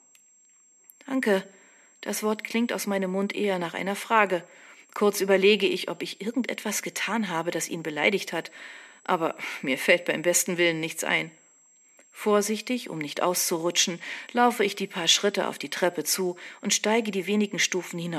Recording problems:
thin; very slightly; fading below 350 Hz
high-pitched whine; faint; throughout; 7.5 kHz, 30 dB below the speech
abrupt cut into speech; at the end

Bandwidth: 14 kHz